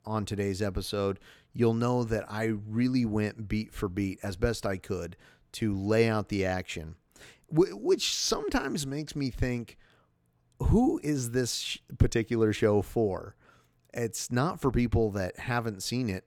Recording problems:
none

